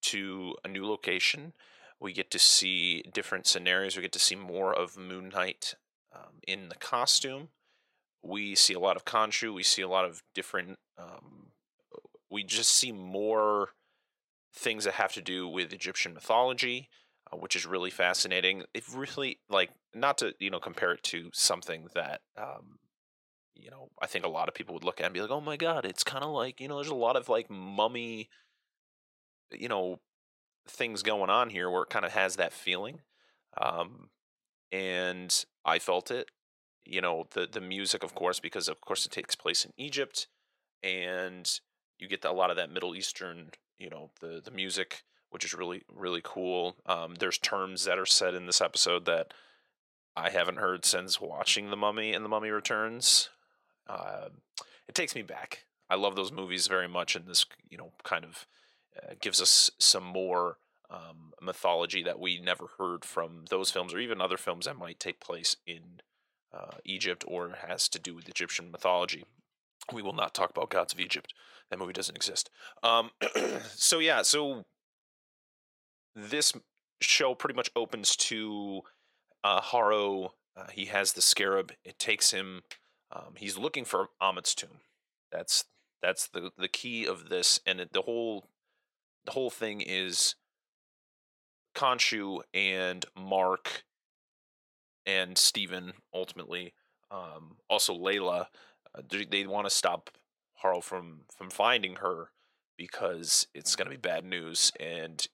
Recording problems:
thin; very; fading below 650 Hz

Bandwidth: 16.5 kHz